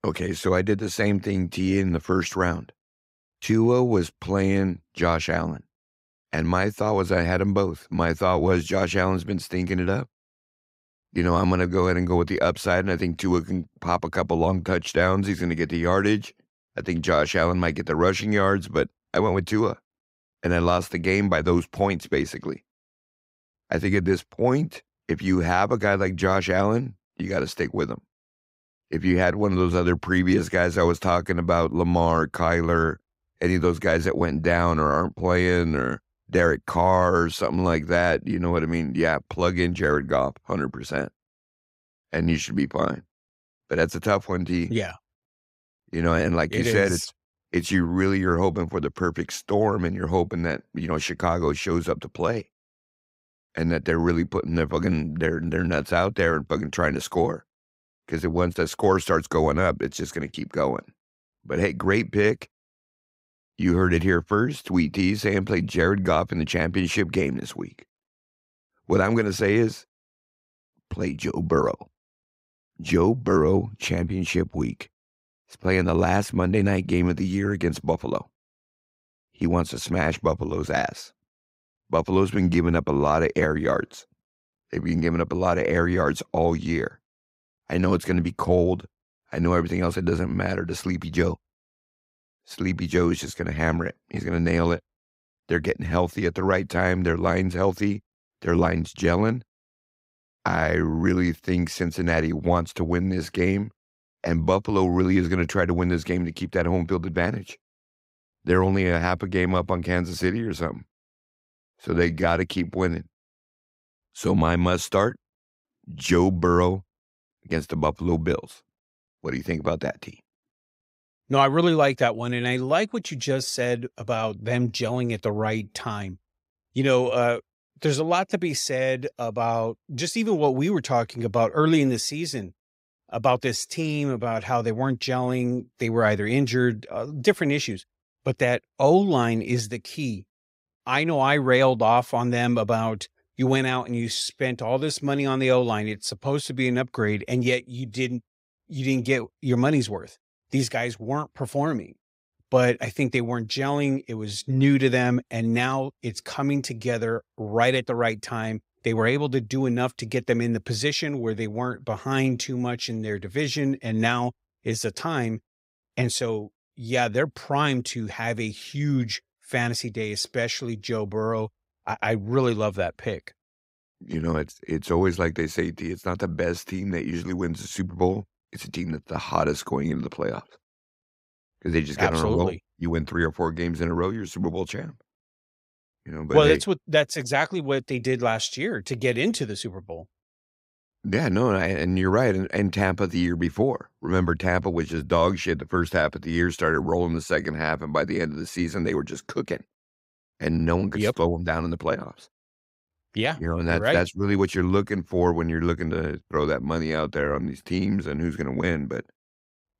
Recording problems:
none

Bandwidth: 15.5 kHz